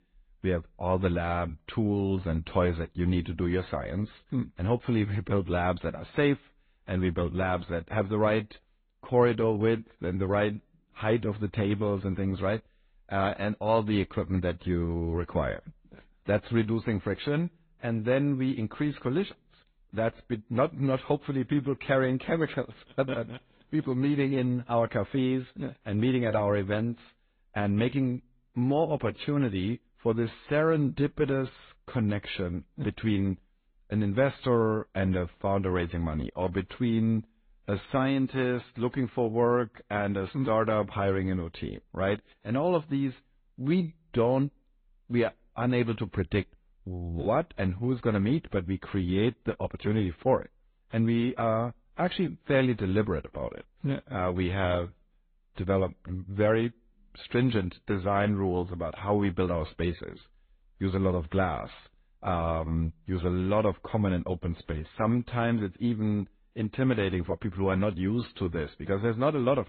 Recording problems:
high frequencies cut off; severe; nothing above 4 kHz
garbled, watery; slightly

